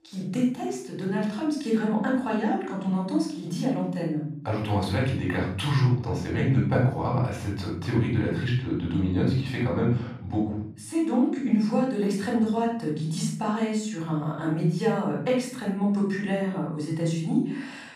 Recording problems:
off-mic speech; far
room echo; noticeable; dies away in 0.7 s

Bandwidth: 14.5 kHz